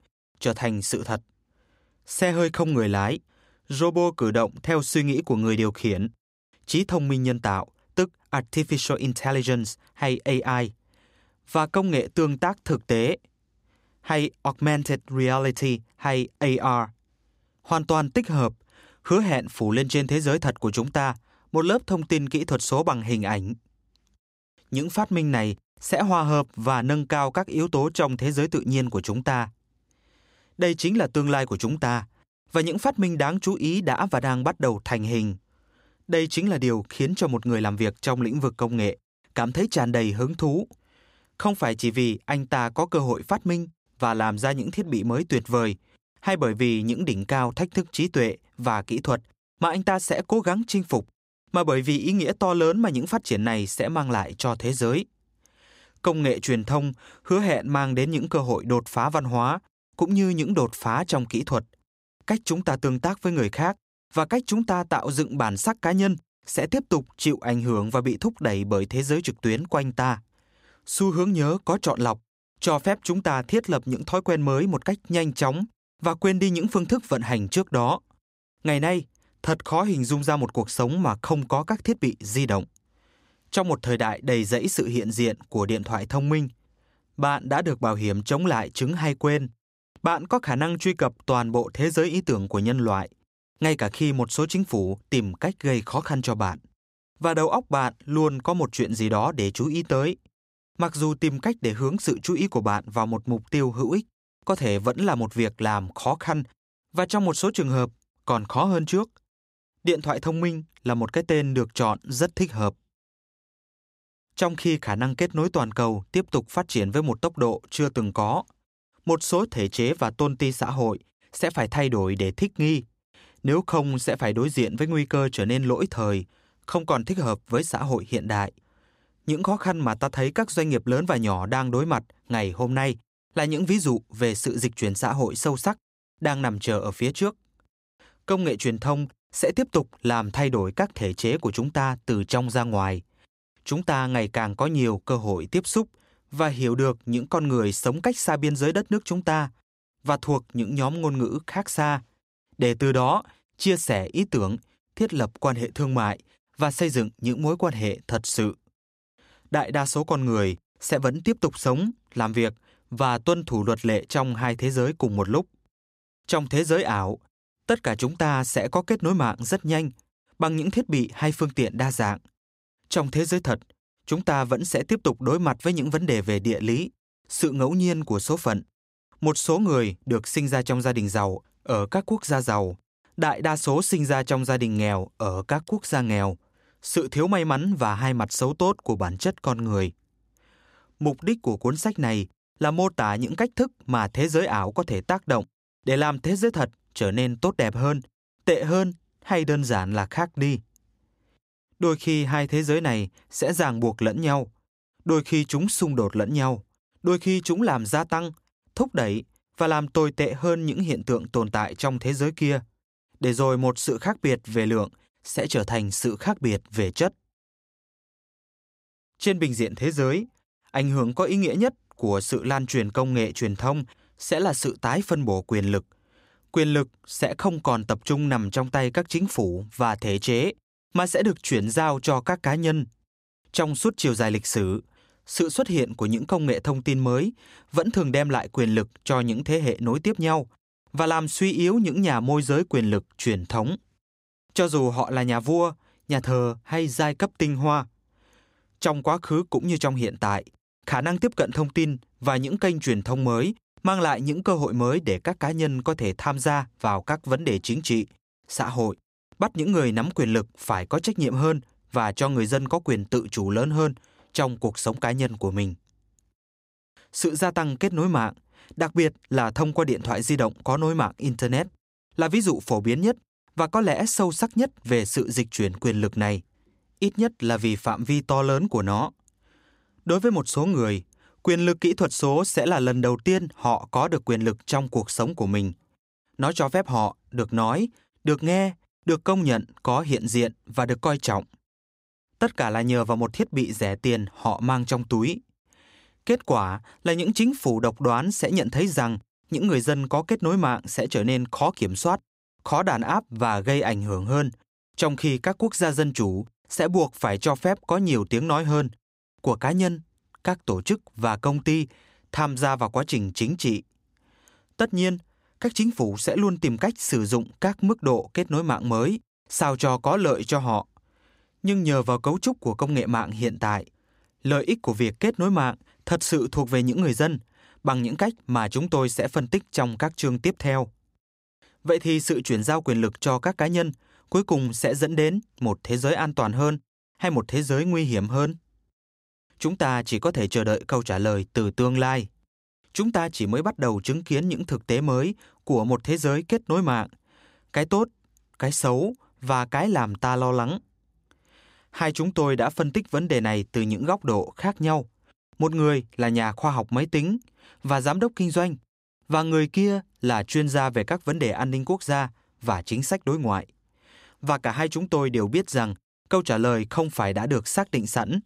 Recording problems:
none

